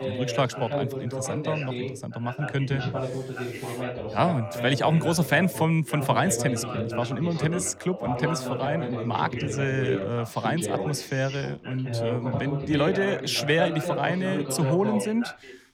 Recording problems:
background chatter; loud; throughout; 2 voices, 5 dB below the speech

